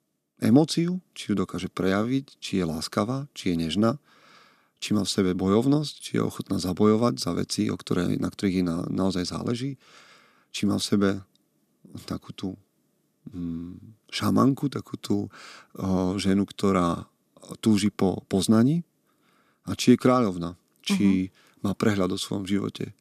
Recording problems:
none

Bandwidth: 14.5 kHz